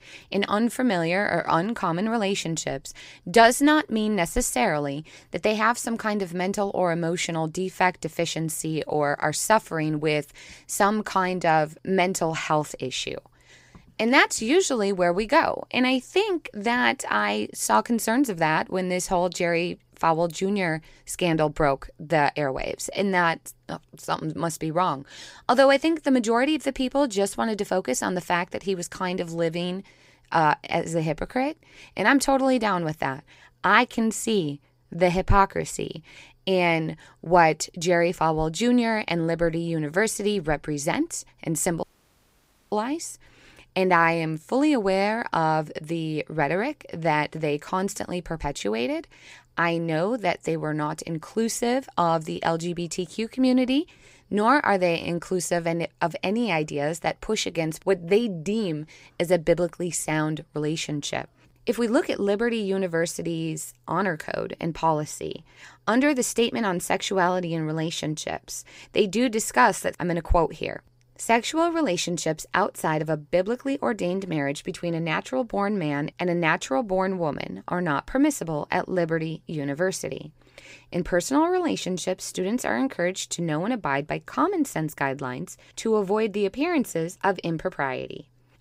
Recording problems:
audio cutting out; at 42 s for 1 s

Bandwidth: 15.5 kHz